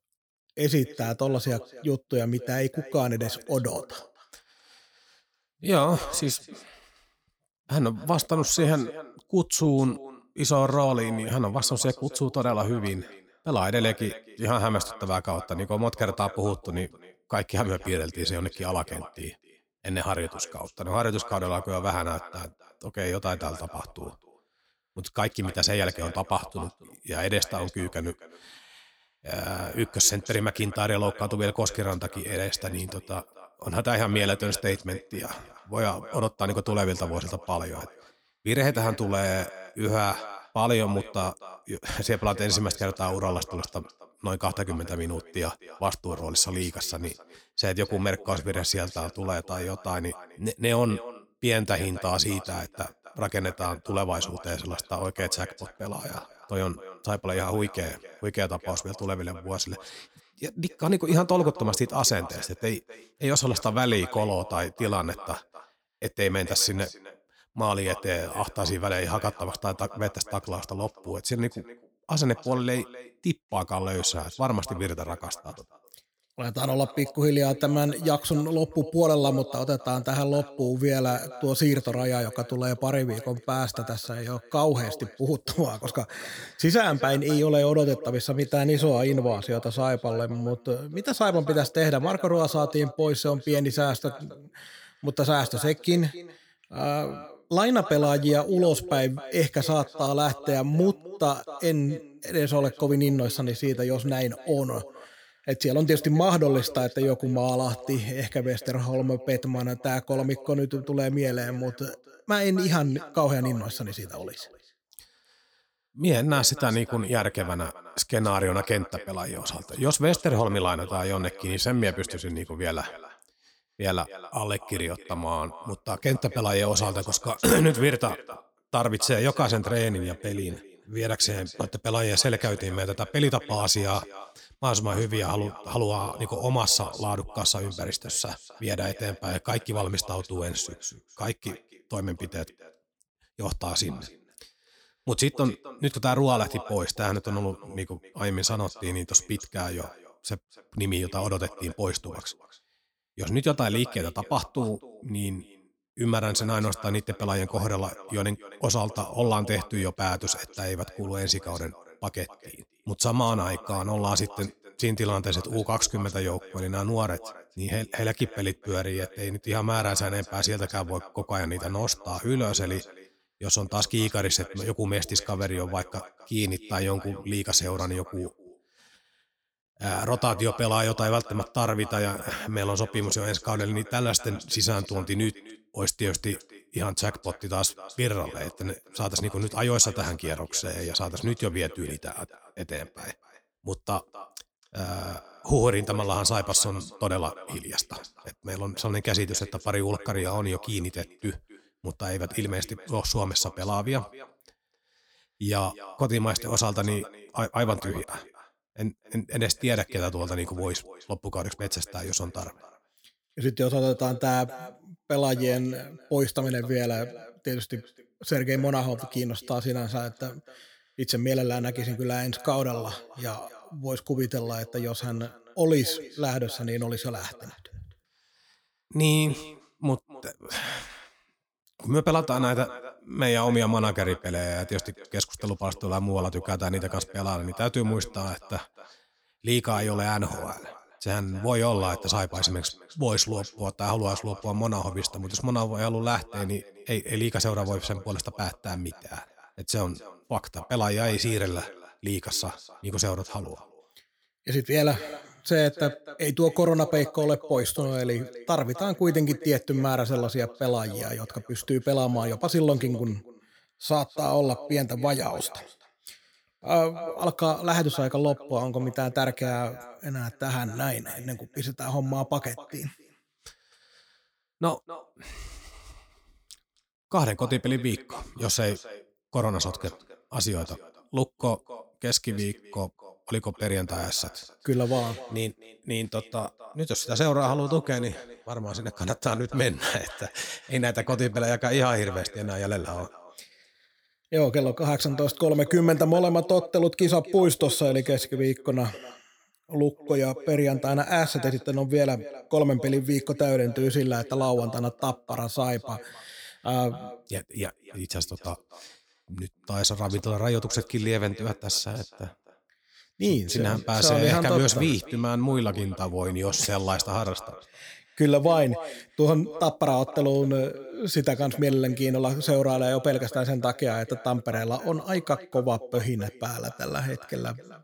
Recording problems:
echo of what is said; noticeable; throughout; 260 ms later, 20 dB below the speech
choppy; occasionally; at 3:28; 4% of the speech affected

